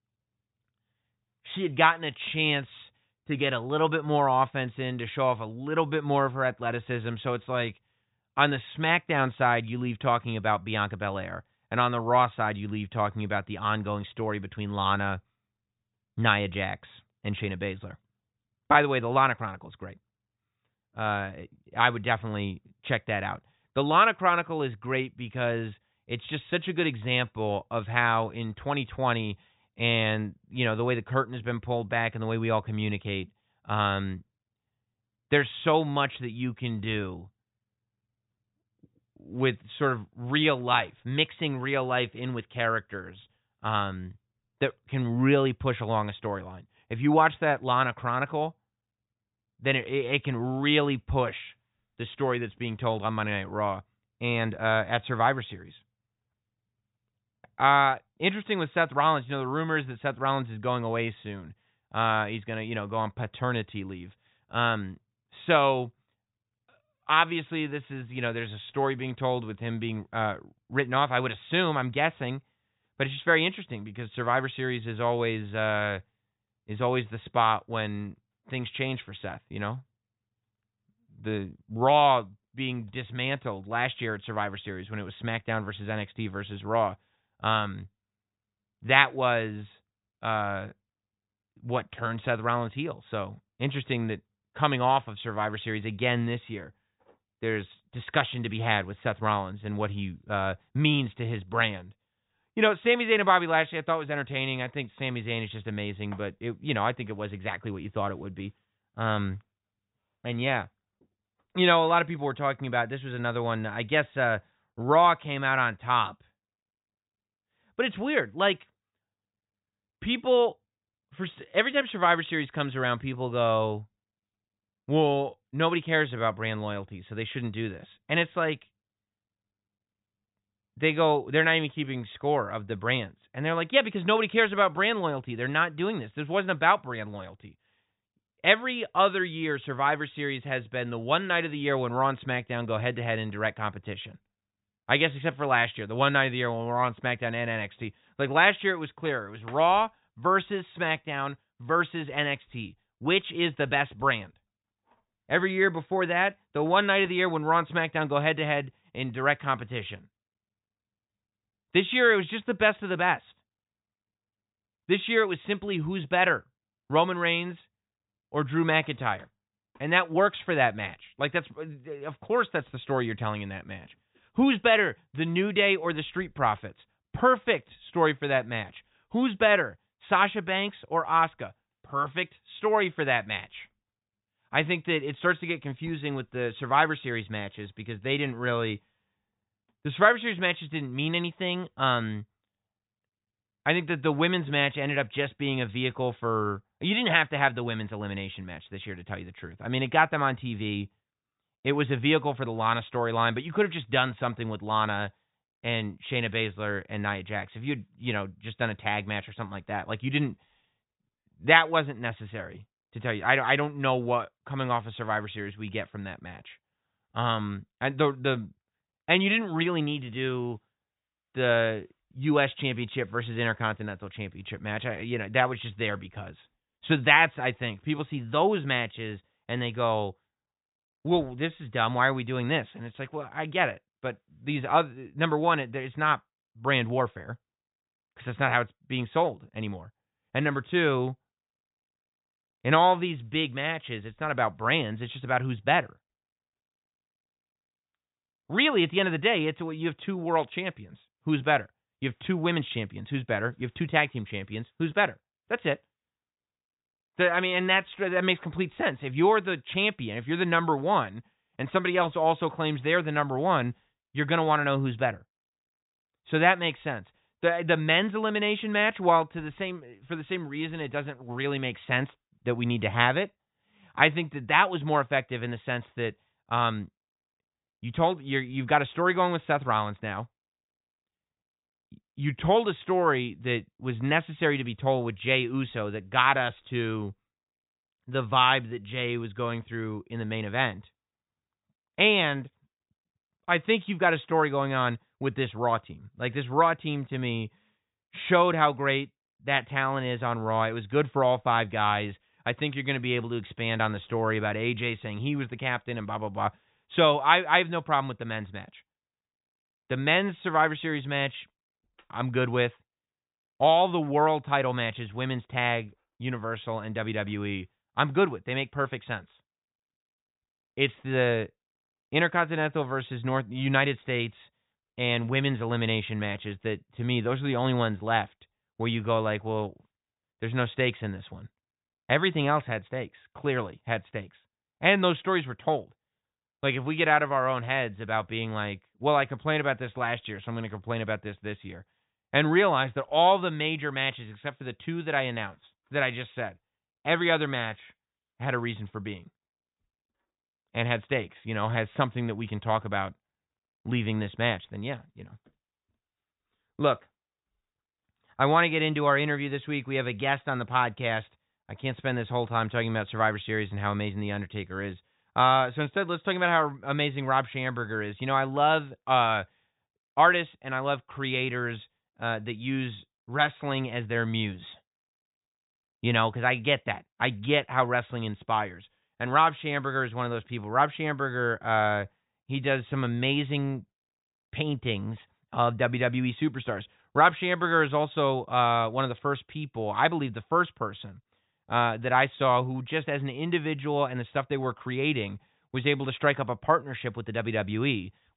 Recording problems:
high frequencies cut off; severe; nothing above 4 kHz

